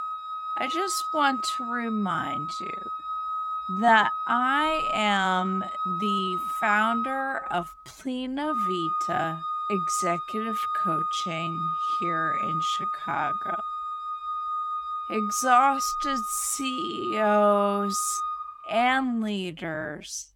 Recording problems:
wrong speed, natural pitch; too slow; 0.5 times normal speed
background music; loud; throughout; 2 dB below the speech

